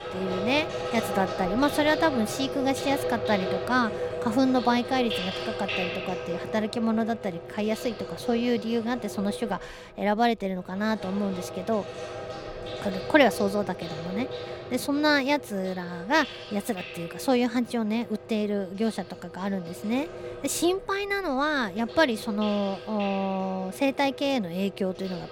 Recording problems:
household noises; loud; throughout; 8 dB below the speech

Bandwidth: 17 kHz